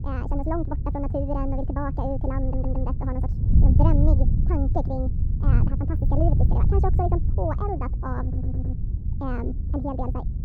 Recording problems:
muffled; very; fading above 1.5 kHz
wrong speed and pitch; too fast and too high; 1.6 times normal speed
wind noise on the microphone; heavy; 8 dB below the speech
audio stuttering; at 2.5 s and at 8 s

